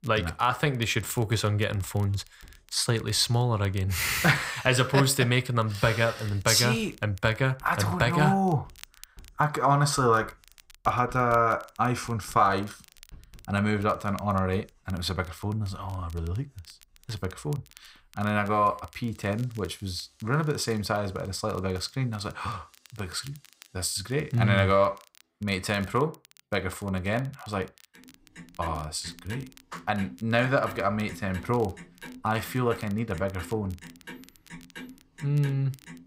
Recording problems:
household noises; faint; throughout; 20 dB below the speech
crackle, like an old record; faint; 25 dB below the speech

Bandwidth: 15.5 kHz